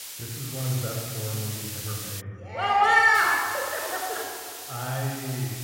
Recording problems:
room echo; strong; dies away in 2.5 s
off-mic speech; somewhat distant
hiss; loud; until 2 s and from 3 s on; 10 dB below the speech

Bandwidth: 16 kHz